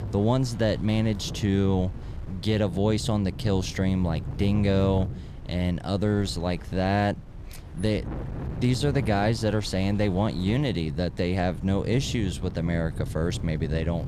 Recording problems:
wind noise on the microphone; occasional gusts; 15 dB below the speech

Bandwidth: 14.5 kHz